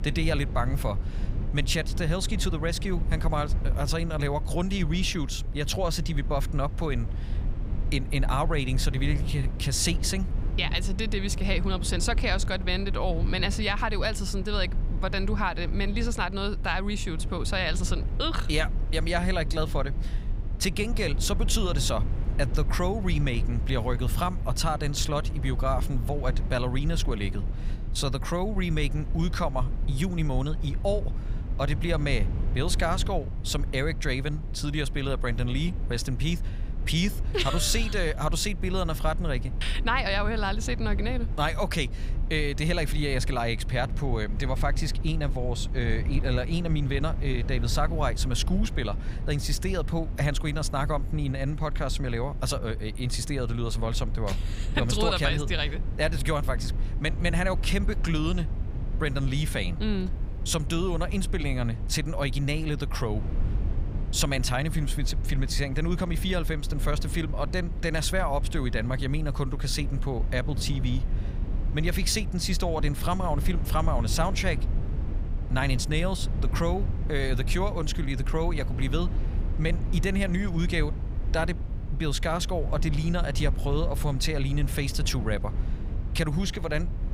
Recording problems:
low rumble; noticeable; throughout; 15 dB below the speech

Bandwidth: 15.5 kHz